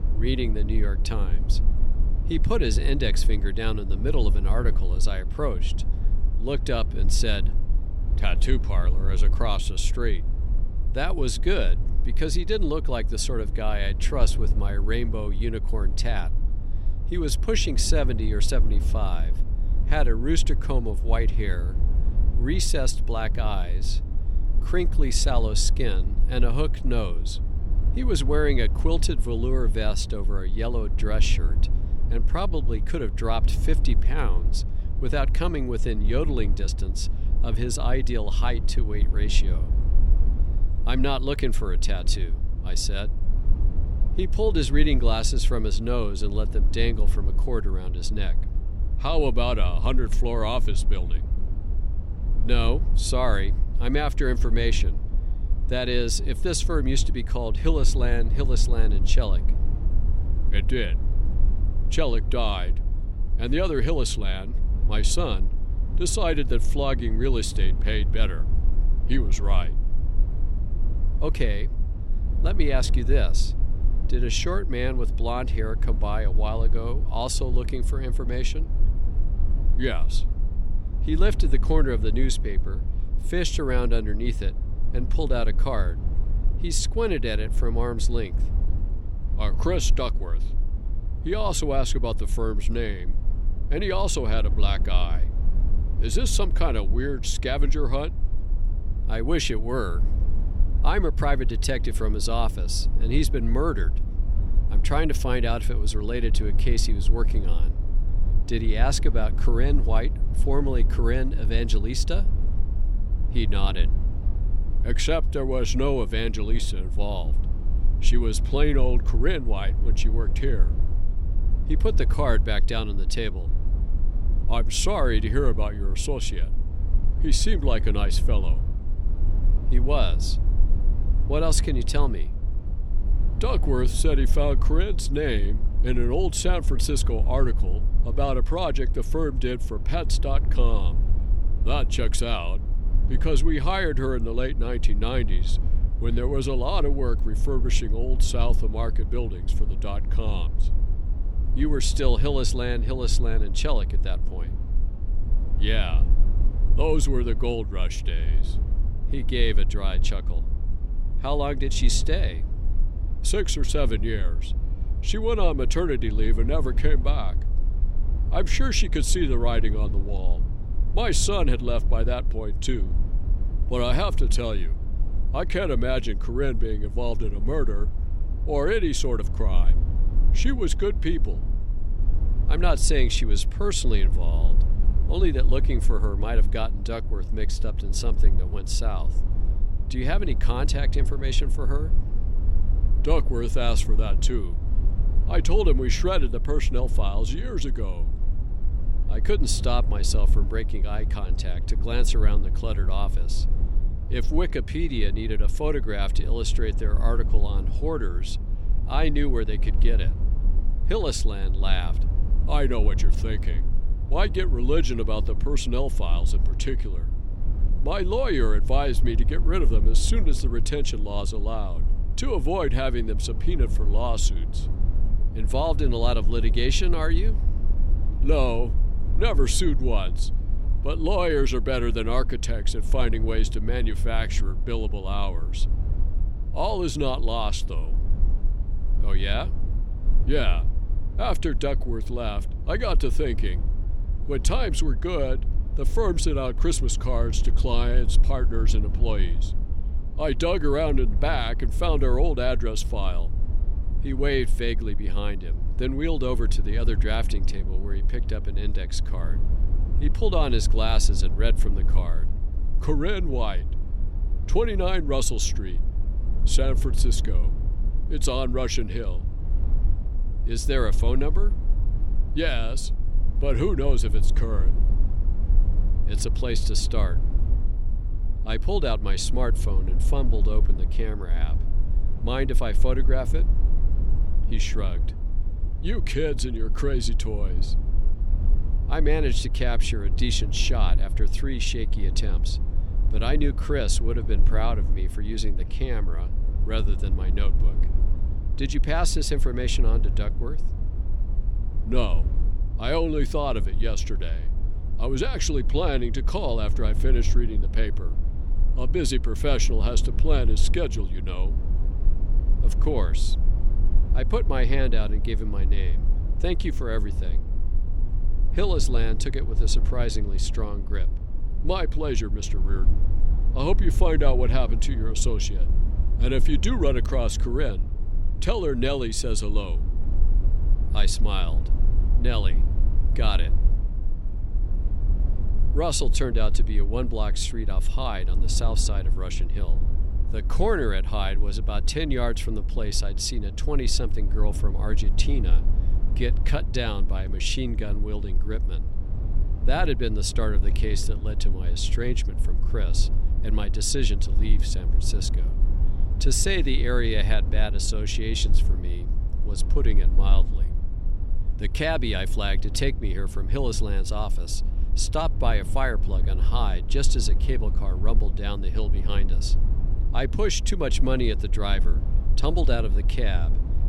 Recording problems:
low rumble; noticeable; throughout; 15 dB below the speech

